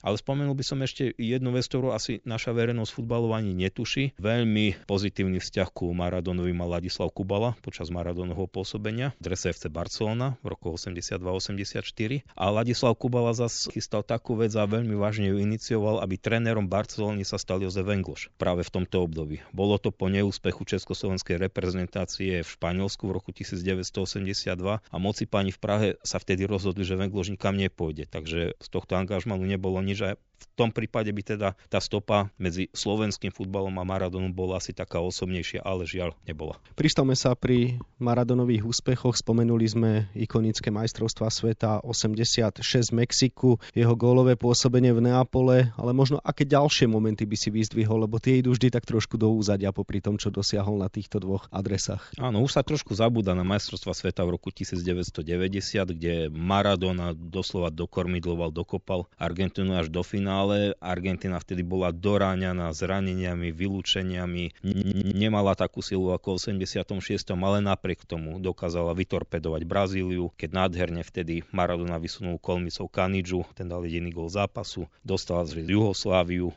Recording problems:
high frequencies cut off; noticeable; nothing above 7.5 kHz
audio stuttering; at 1:05

